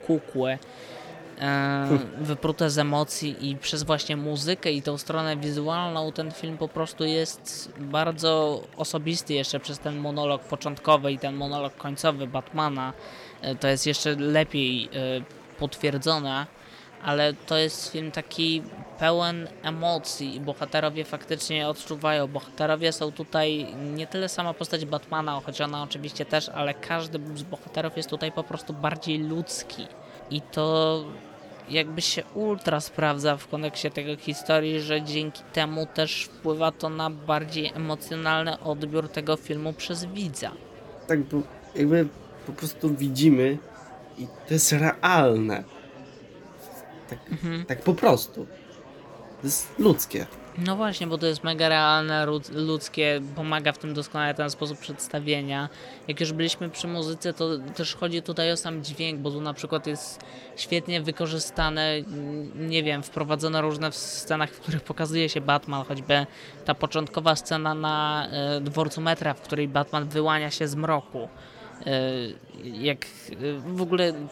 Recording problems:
murmuring crowd; noticeable; throughout; 20 dB below the speech

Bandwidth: 17.5 kHz